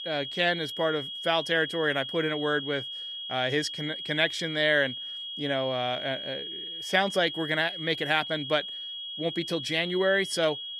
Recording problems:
high-pitched whine; loud; throughout; 3.5 kHz, 7 dB below the speech

